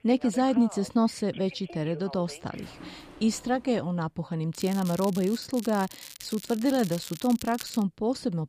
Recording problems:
alarms or sirens; noticeable; until 3.5 s; 20 dB below the speech
crackling; noticeable; from 4.5 to 8 s; 15 dB below the speech

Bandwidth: 15 kHz